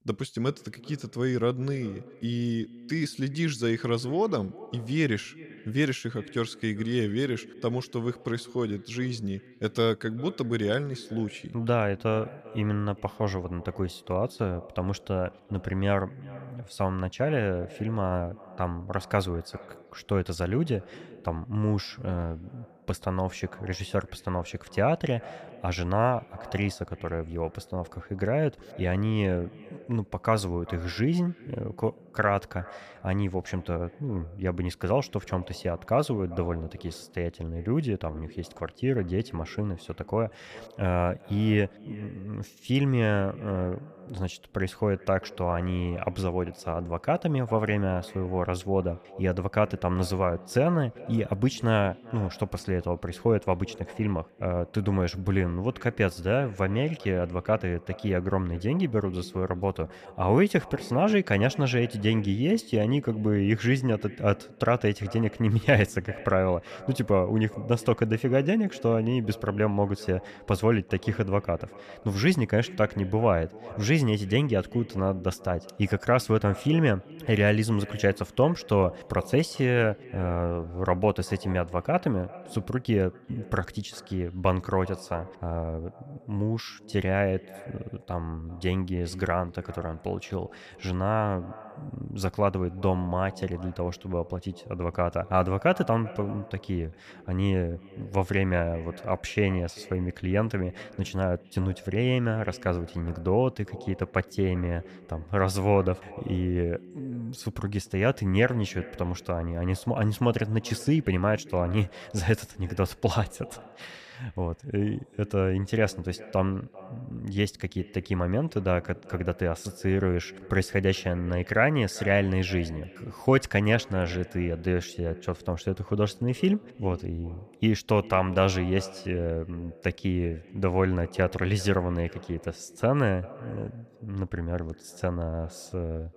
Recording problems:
echo of what is said; faint; throughout; 390 ms later, 20 dB below the speech

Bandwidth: 14.5 kHz